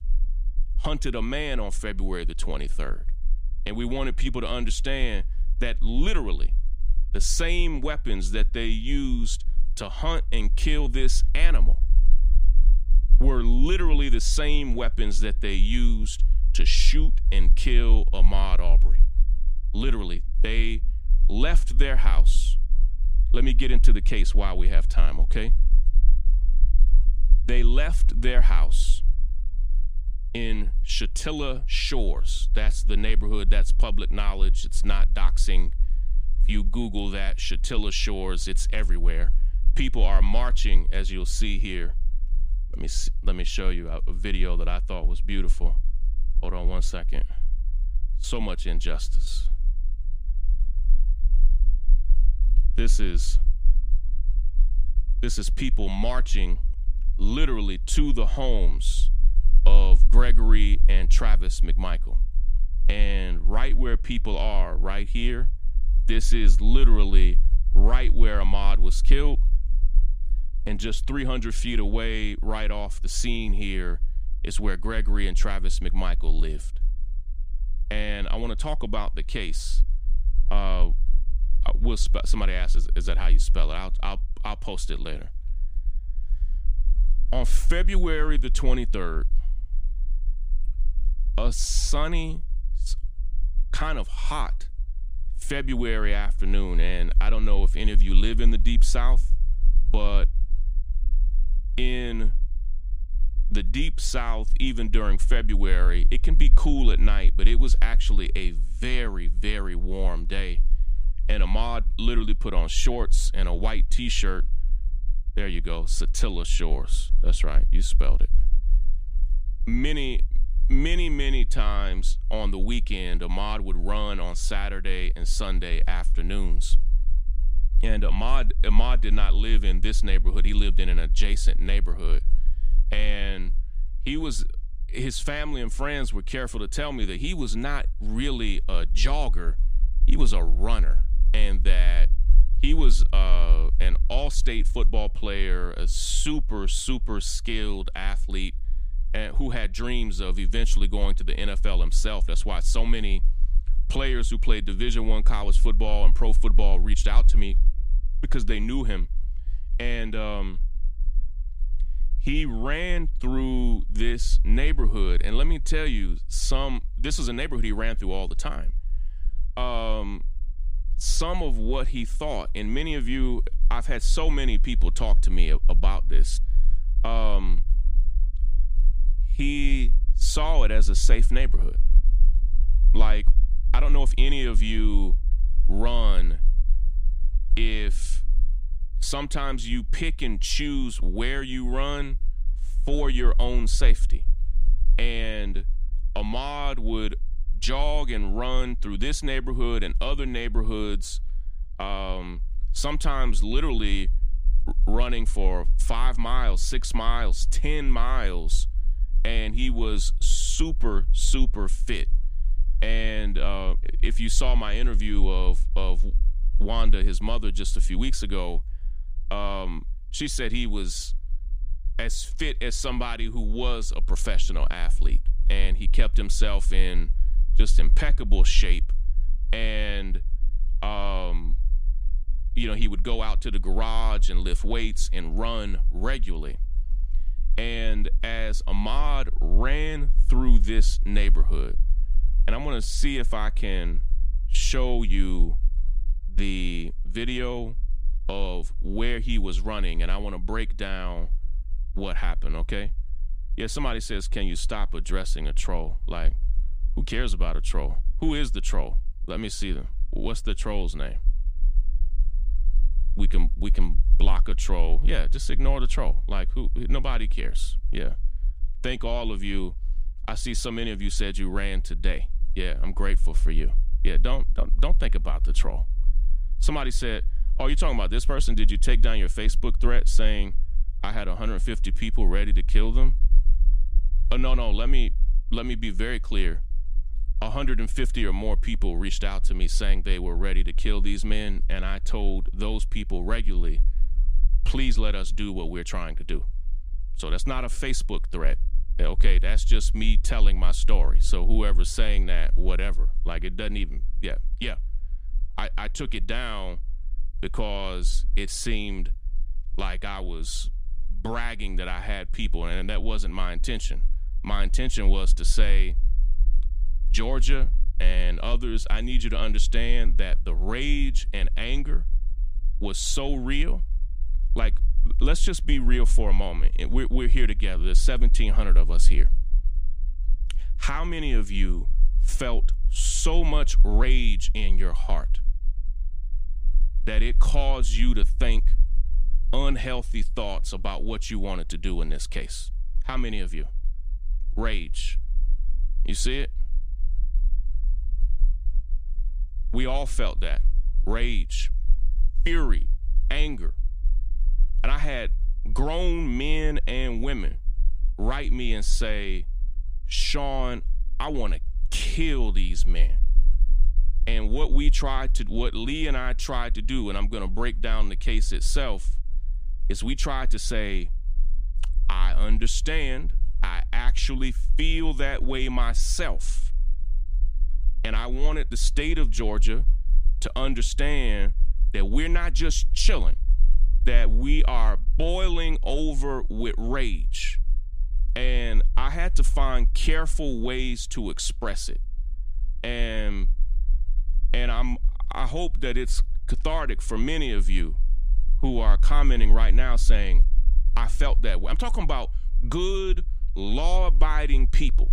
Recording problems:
low rumble; faint; throughout; 25 dB below the speech

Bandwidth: 15 kHz